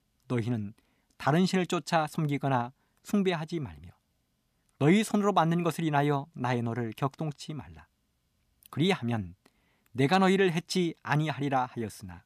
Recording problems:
none

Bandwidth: 14.5 kHz